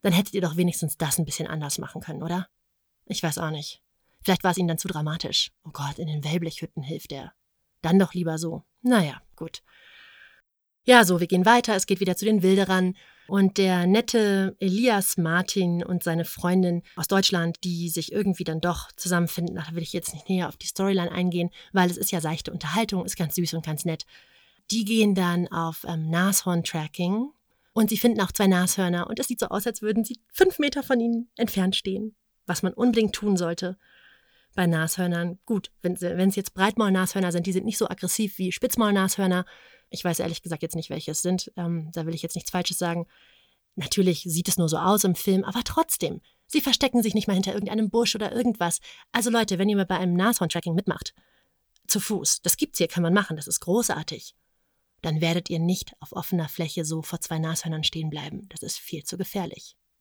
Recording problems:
uneven, jittery; strongly; from 2 to 59 s

